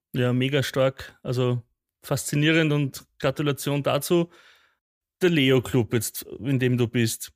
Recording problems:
none

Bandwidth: 15 kHz